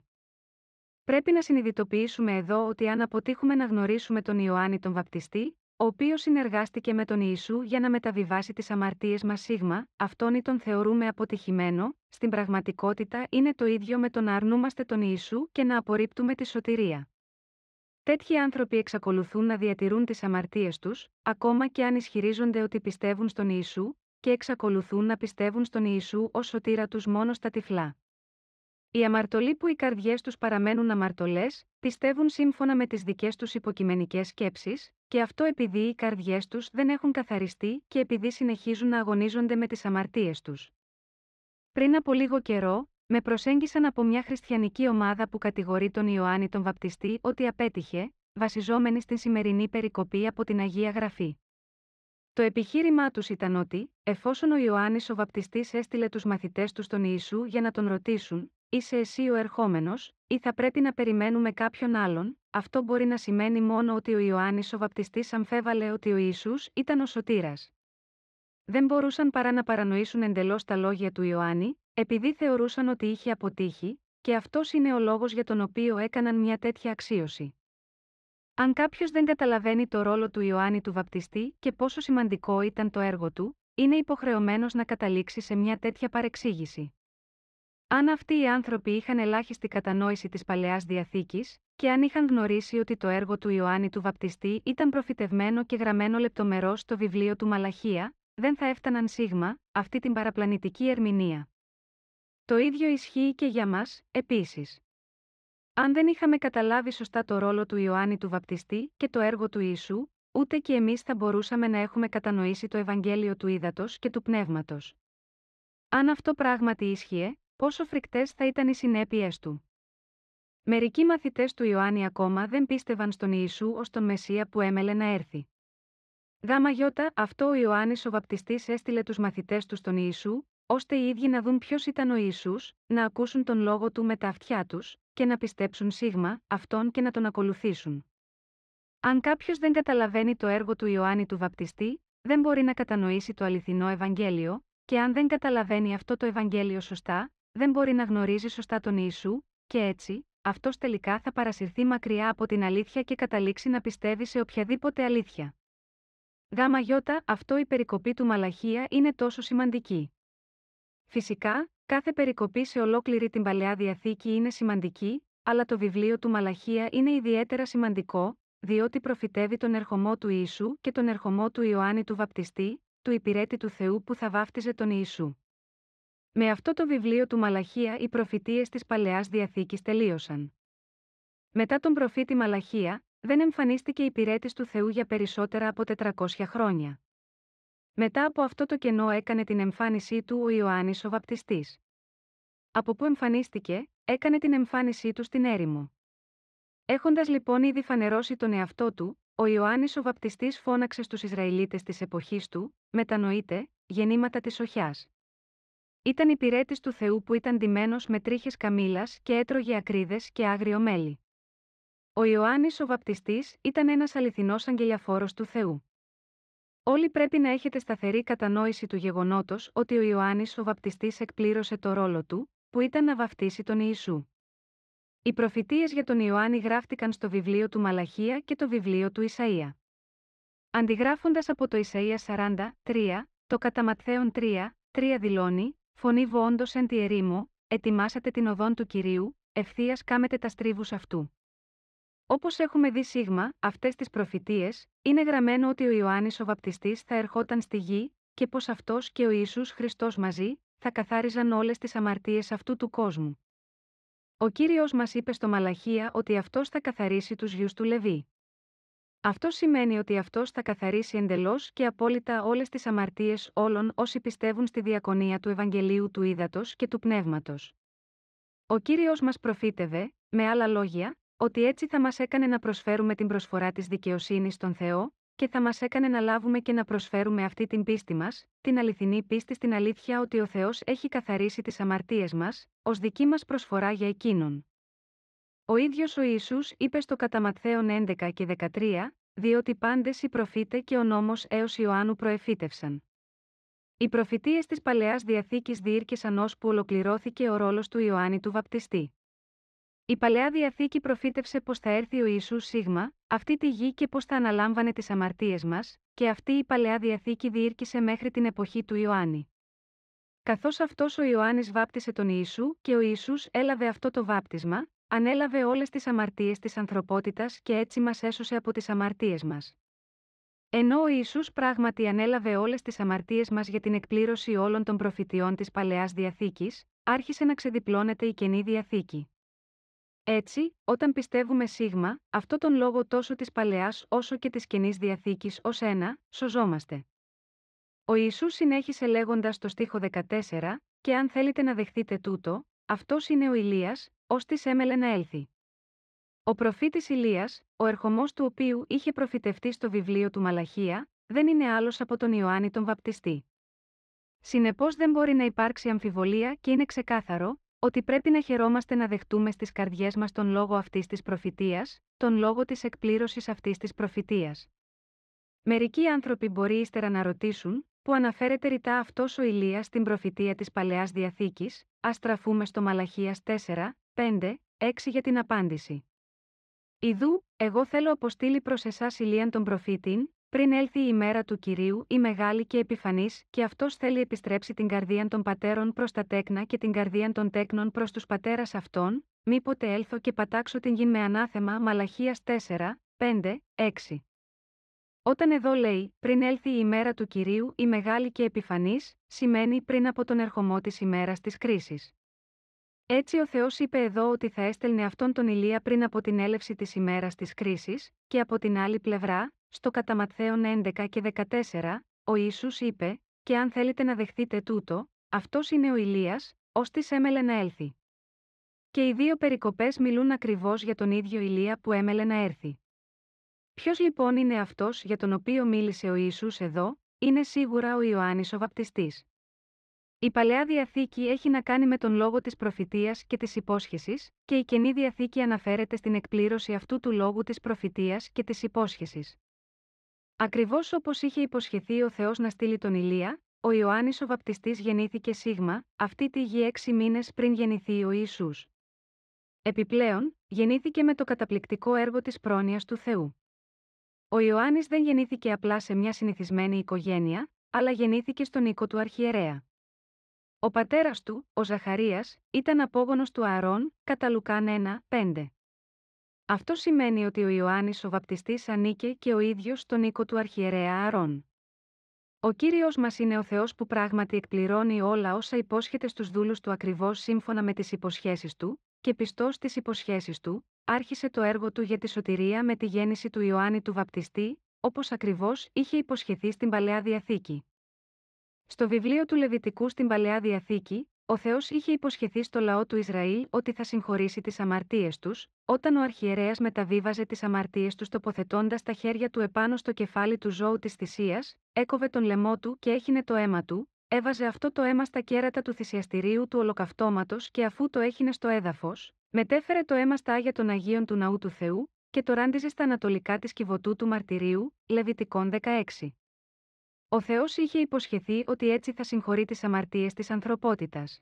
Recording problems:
muffled; slightly; fading above 3.5 kHz

